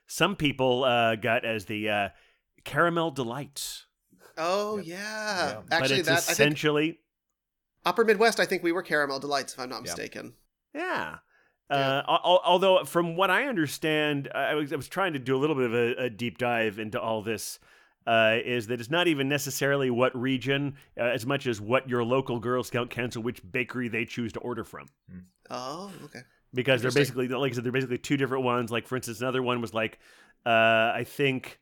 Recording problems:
none

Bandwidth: 18.5 kHz